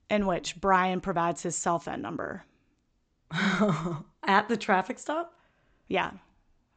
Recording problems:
high frequencies cut off; noticeable; nothing above 8 kHz

